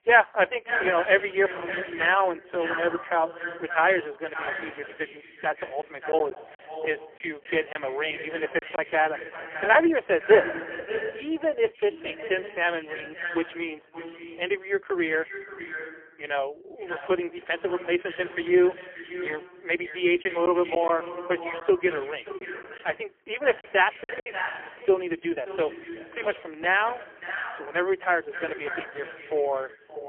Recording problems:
phone-call audio; poor line; nothing above 3 kHz
echo of what is said; strong; throughout; 580 ms later, 10 dB below the speech
choppy; very; from 6 to 9 s and from 20 to 24 s; 5% of the speech affected

